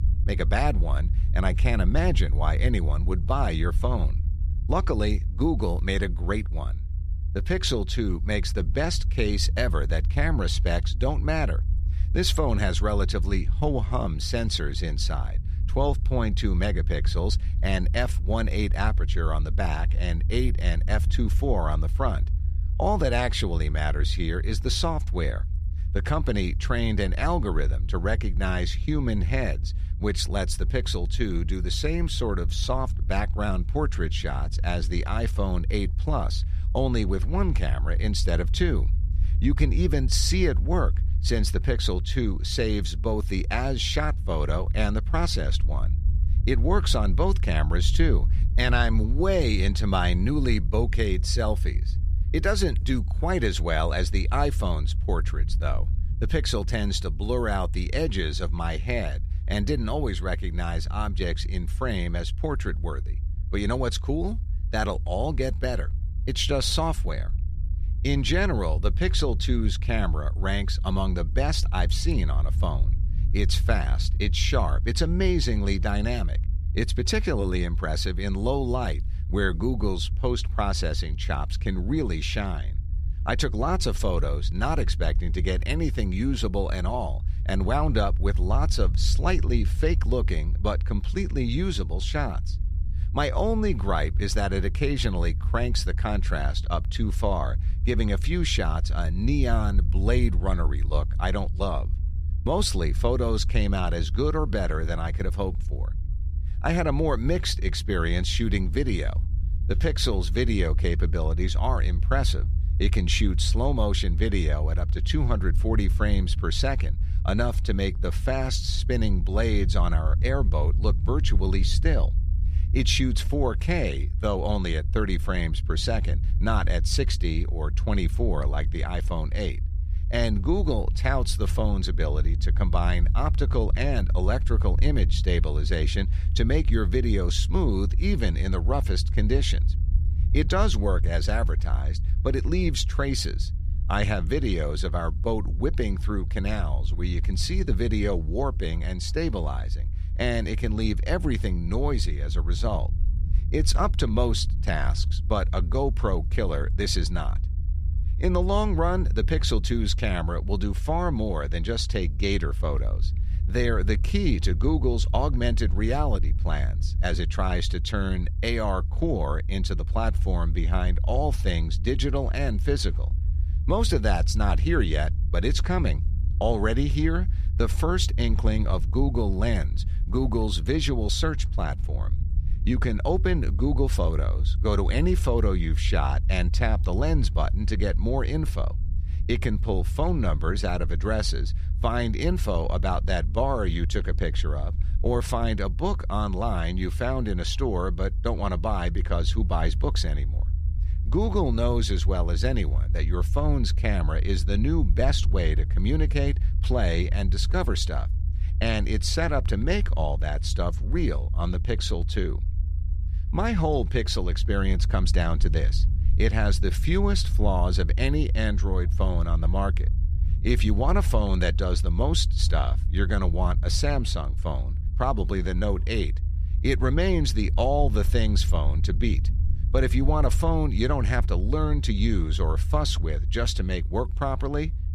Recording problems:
low rumble; noticeable; throughout; 15 dB below the speech

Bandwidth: 14.5 kHz